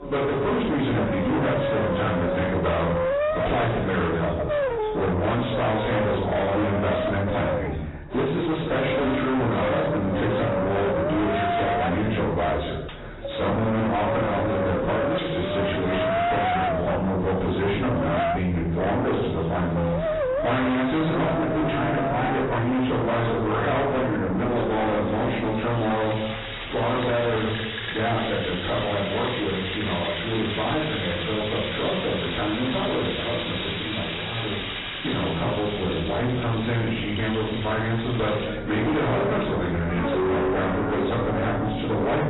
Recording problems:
distortion; heavy; 5 dB below the speech
off-mic speech; far
garbled, watery; badly; nothing above 4 kHz
room echo; noticeable; dies away in 0.6 s
background music; loud; throughout; 3 dB below the speech
chatter from many people; noticeable; throughout; 20 dB below the speech
clattering dishes; faint; at 13 s; peak 20 dB below the speech
clattering dishes; noticeable; at 15 s and from 26 to 28 s; peak 8 dB below the speech

